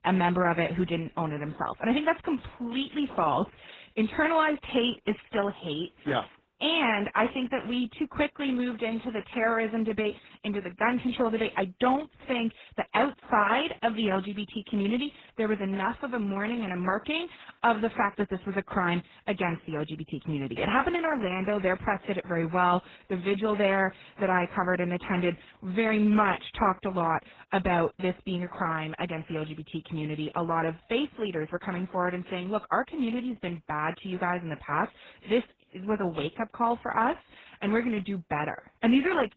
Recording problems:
garbled, watery; badly; nothing above 4 kHz

